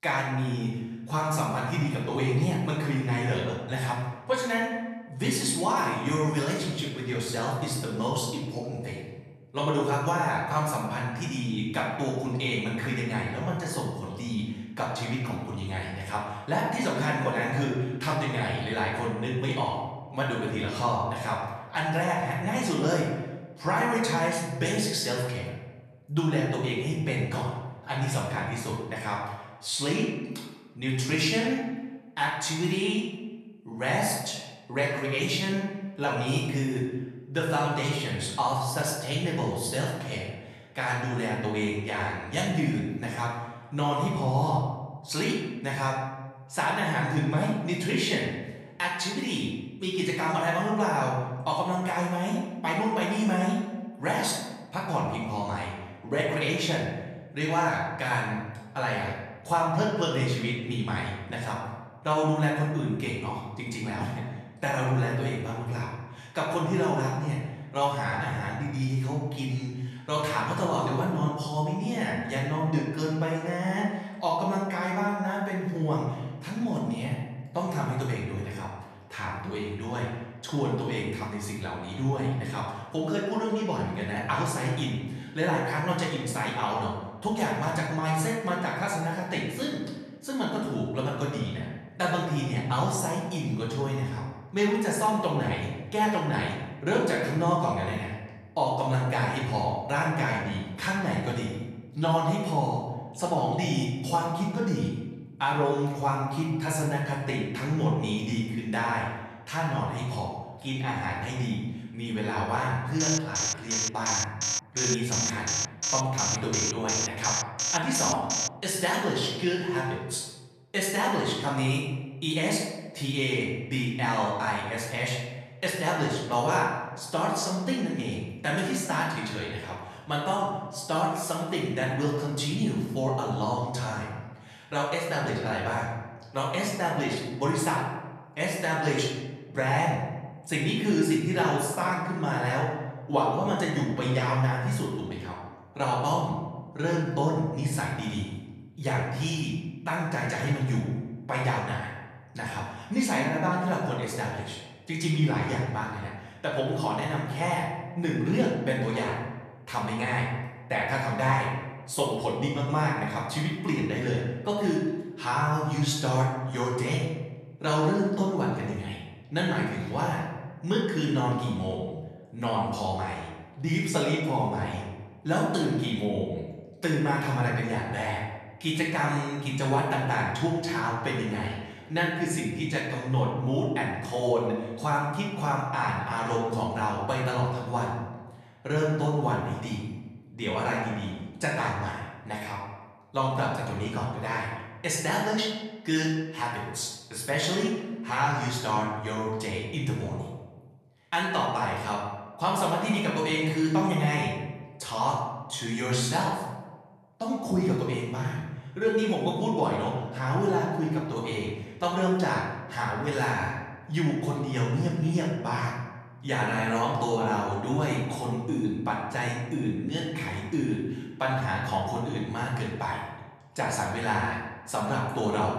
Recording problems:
off-mic speech; far
room echo; noticeable; dies away in 1 s
alarm; loud; from 1:53 to 1:58; peak 2 dB above the speech

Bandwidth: 13.5 kHz